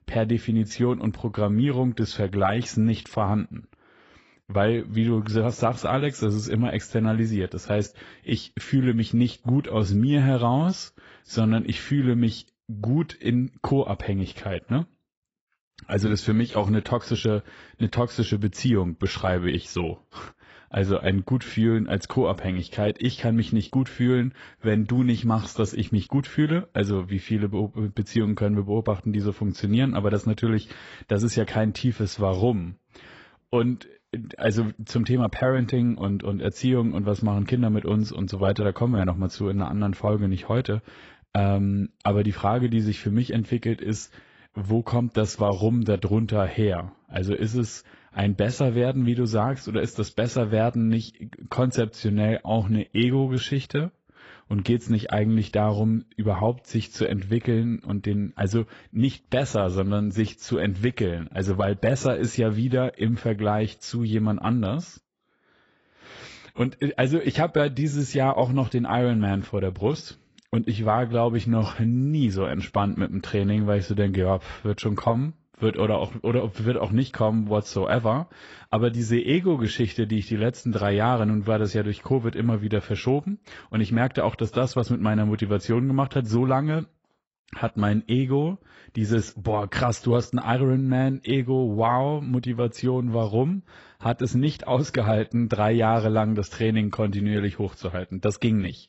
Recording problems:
garbled, watery; badly; nothing above 8 kHz

